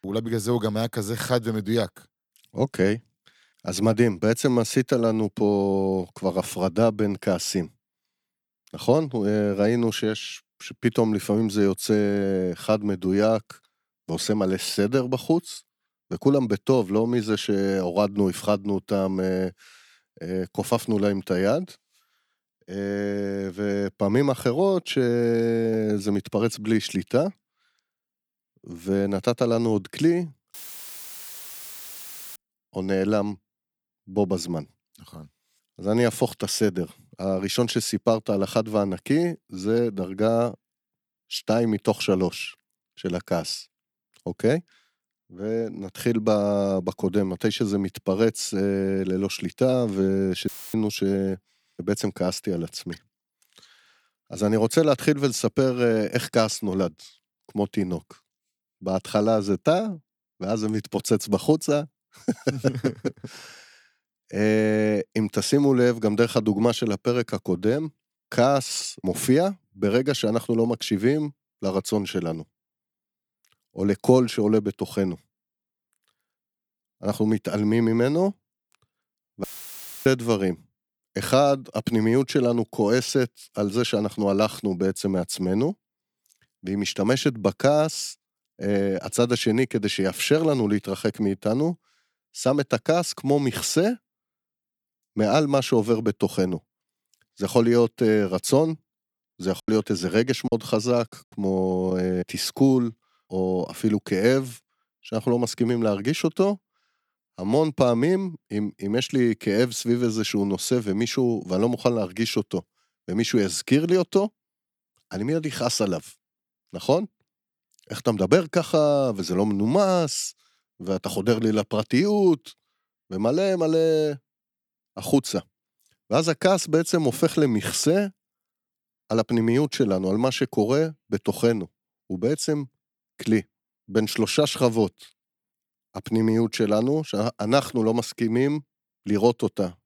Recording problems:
audio cutting out; filled with static; at 31 s for 2 s, at 50 s and at 1:19 for 0.5 s
choppy; very; at 1:40; 7% of the speech affected

